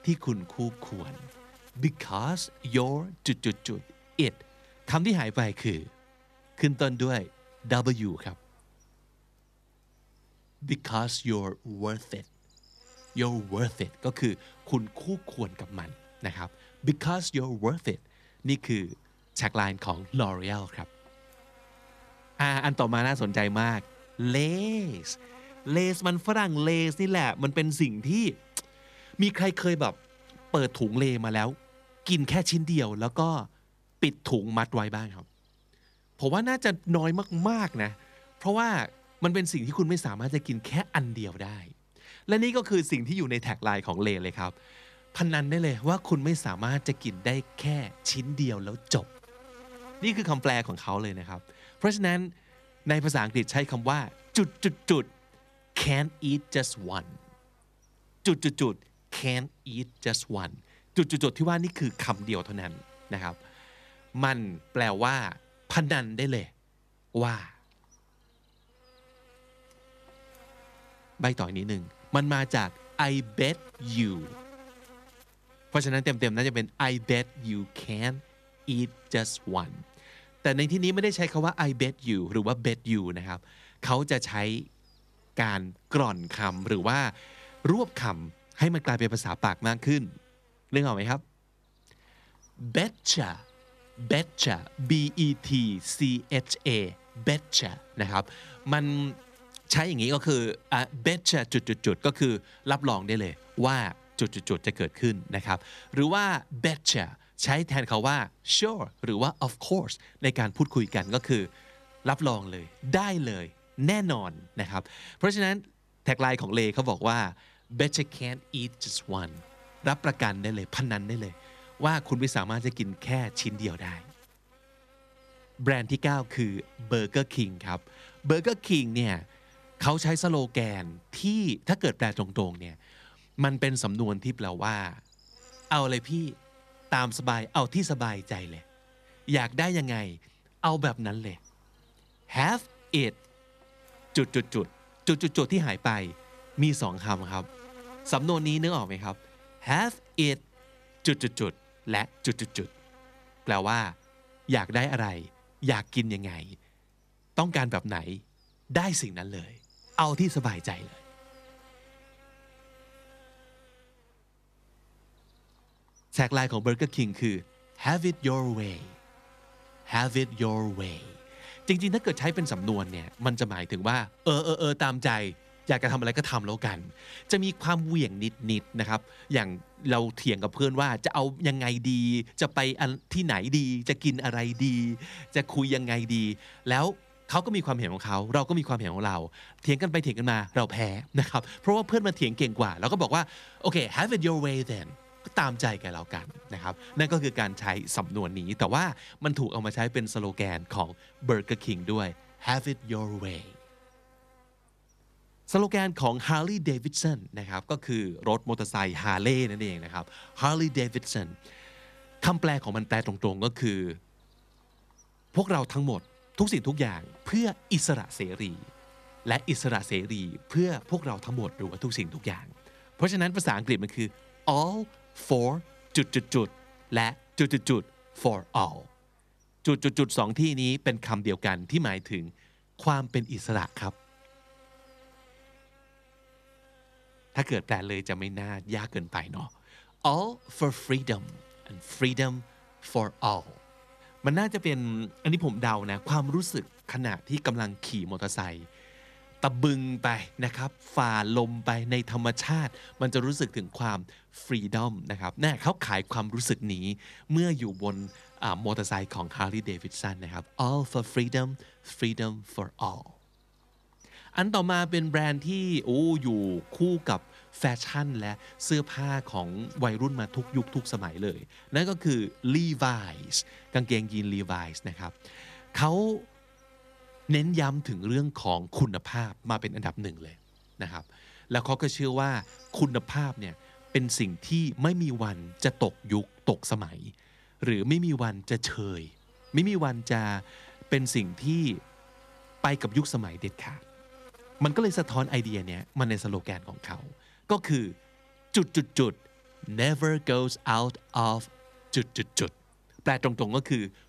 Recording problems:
electrical hum; faint; throughout; 50 Hz, 25 dB below the speech

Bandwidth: 14.5 kHz